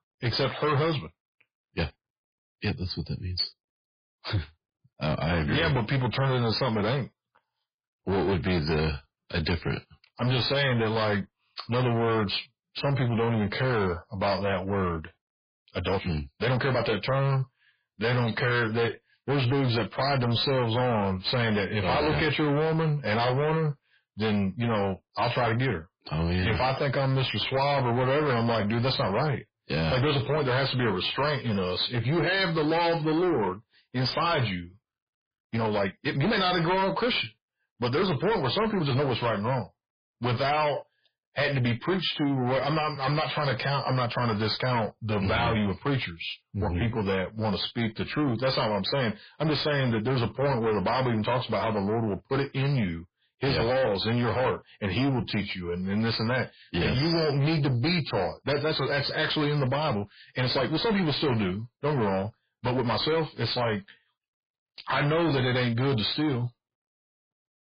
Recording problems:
distortion; heavy; 6 dB below the speech
garbled, watery; badly; nothing above 4 kHz
uneven, jittery; strongly; from 8.5 s to 1:03

